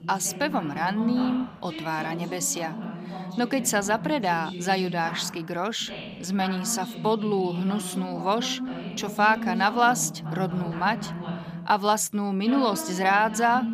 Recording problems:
voice in the background; loud; throughout; 9 dB below the speech

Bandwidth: 15 kHz